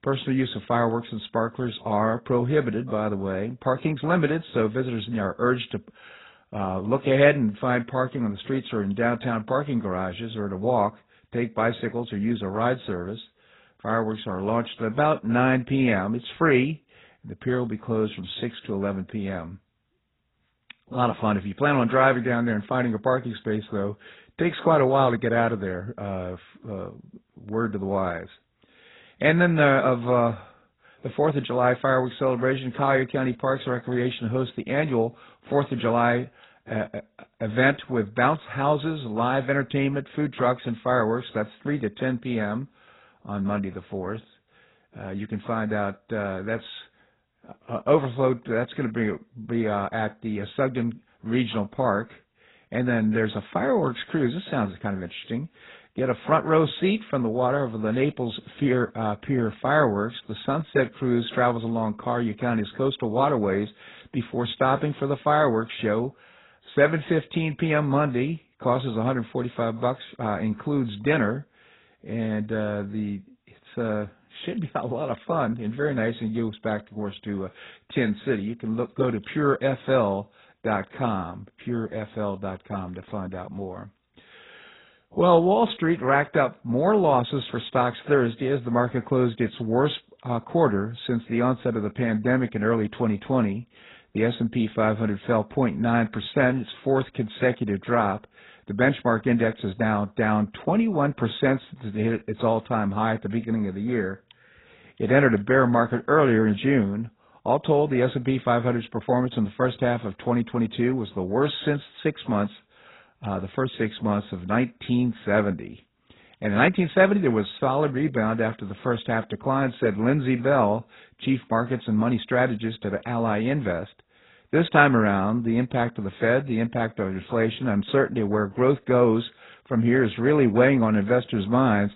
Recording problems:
garbled, watery; badly; nothing above 4 kHz

